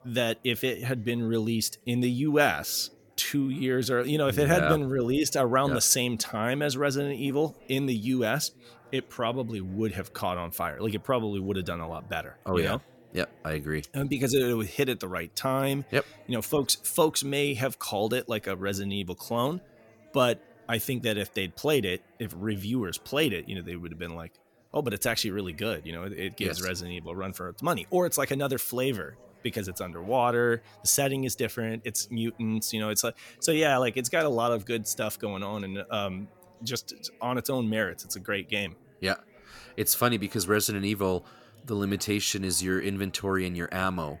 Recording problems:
chatter from many people; faint; throughout; 30 dB below the speech

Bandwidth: 17 kHz